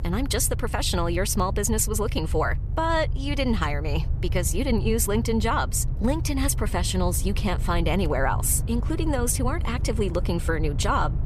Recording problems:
low rumble; noticeable; throughout; 15 dB below the speech

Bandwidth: 14 kHz